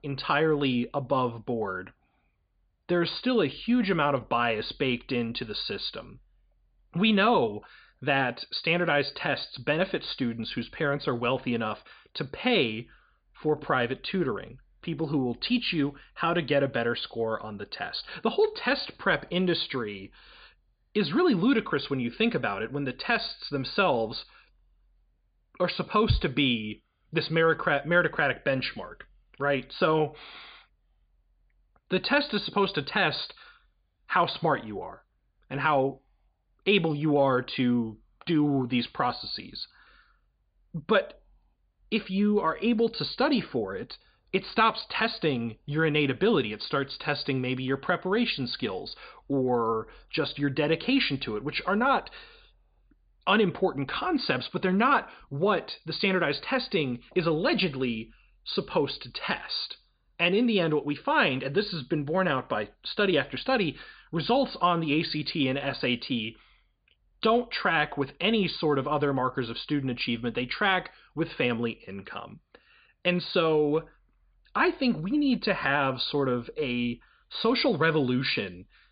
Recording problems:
high frequencies cut off; severe; nothing above 5 kHz

